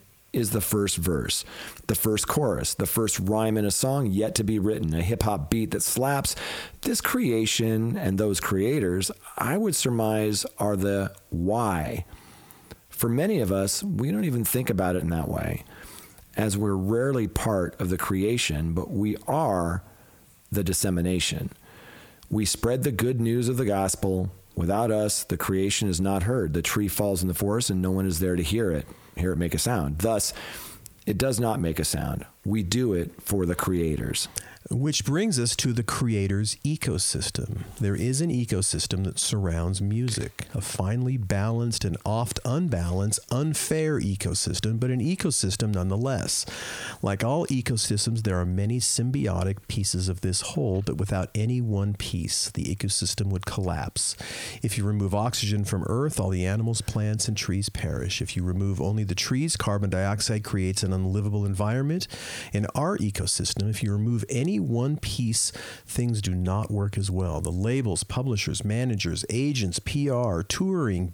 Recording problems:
squashed, flat; heavily

